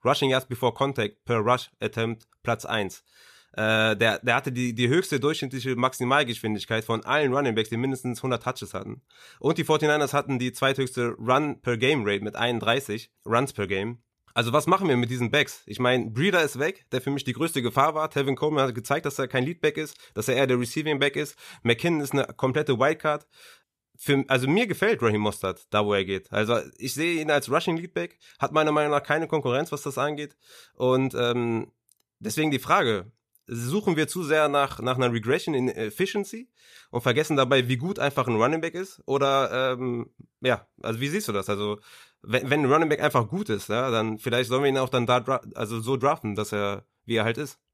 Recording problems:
none

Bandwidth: 14.5 kHz